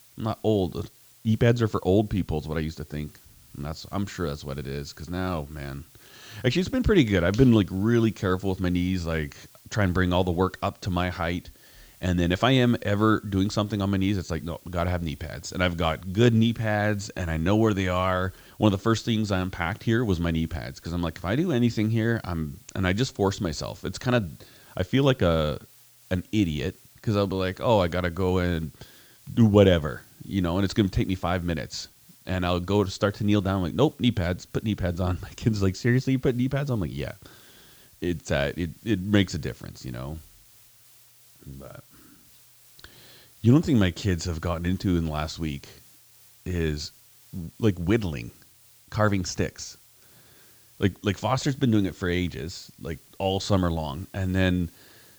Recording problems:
high frequencies cut off; noticeable; nothing above 8 kHz
hiss; faint; throughout; 25 dB below the speech

